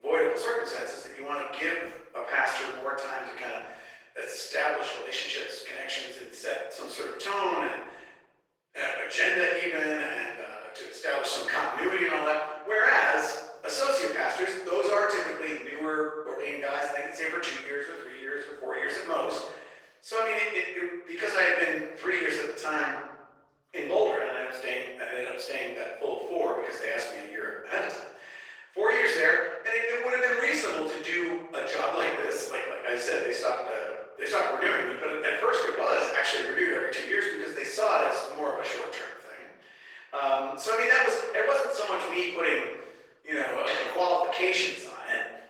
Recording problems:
room echo; strong; dies away in 1 s
off-mic speech; far
thin; very; fading below 400 Hz
garbled, watery; slightly; nothing above 19 kHz
abrupt cut into speech; at the start

